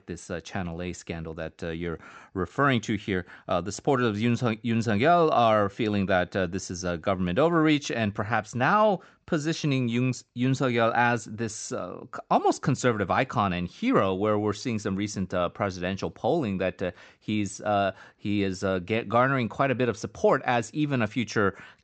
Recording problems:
high frequencies cut off; noticeable; nothing above 8 kHz

